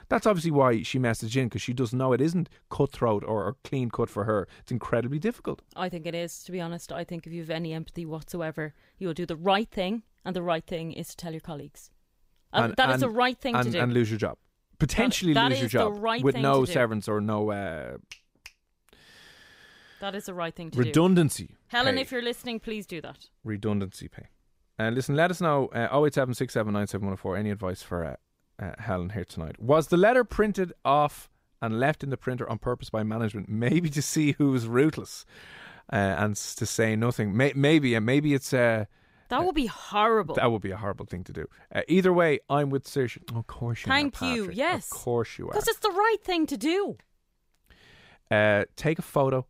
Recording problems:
none

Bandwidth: 15.5 kHz